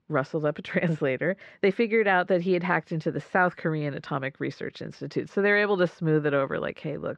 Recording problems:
muffled; slightly; fading above 2.5 kHz

